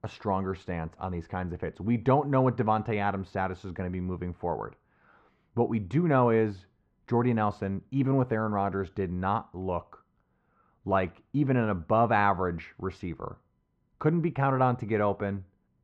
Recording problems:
muffled; very; fading above 1.5 kHz

